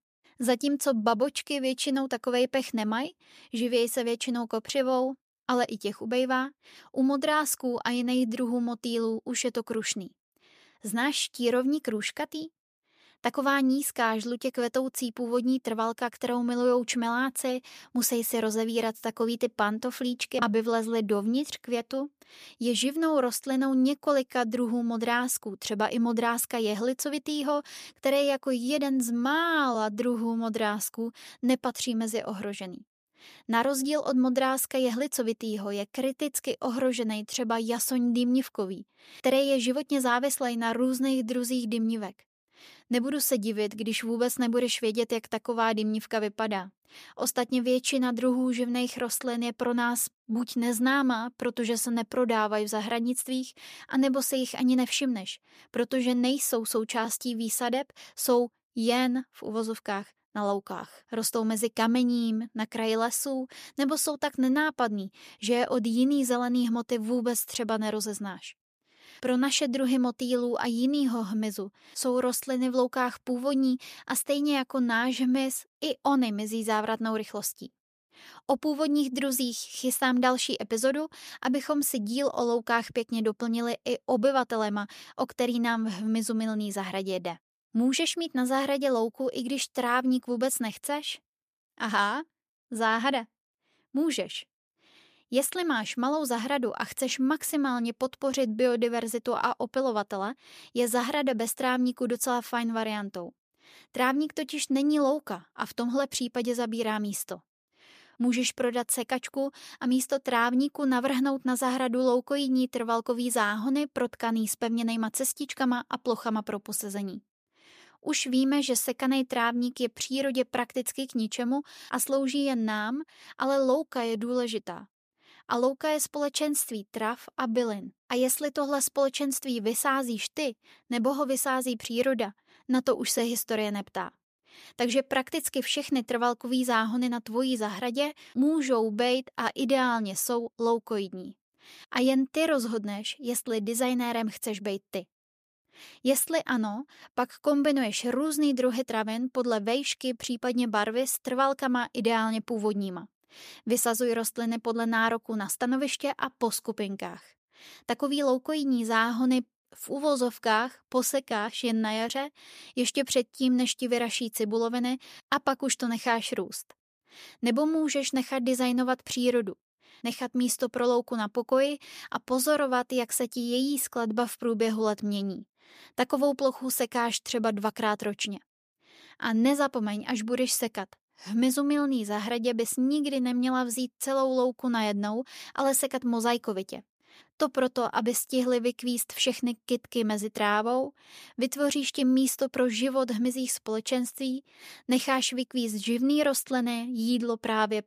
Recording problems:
none

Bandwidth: 14.5 kHz